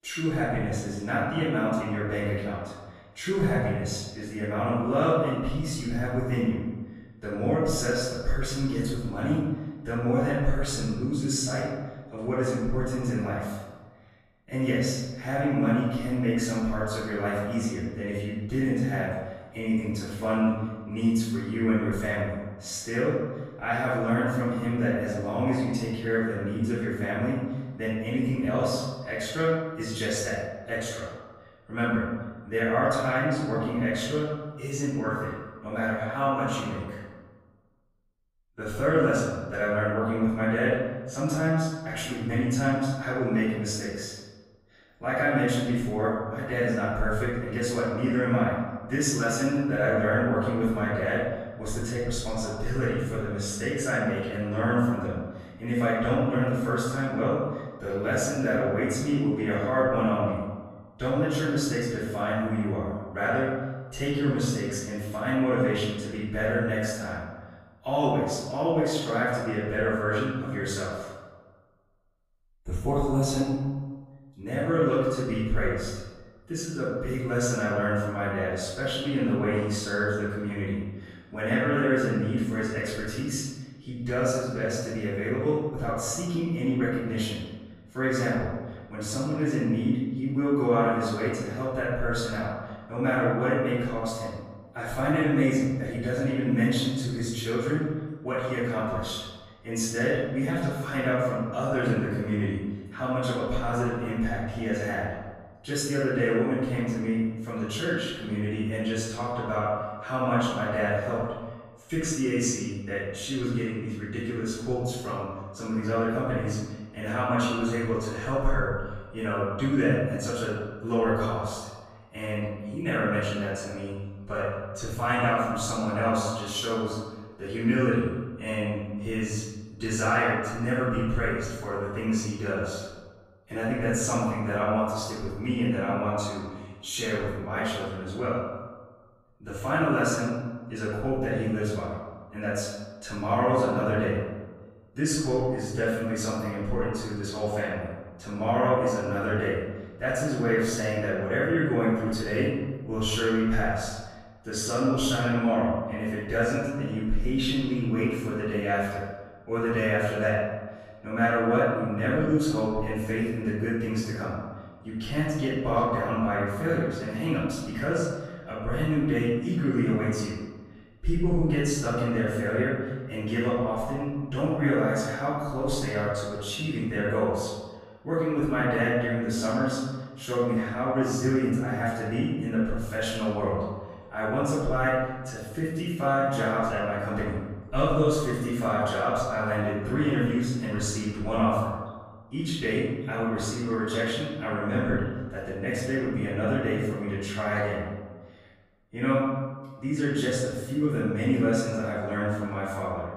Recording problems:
room echo; strong; dies away in 1.2 s
off-mic speech; far

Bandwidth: 15 kHz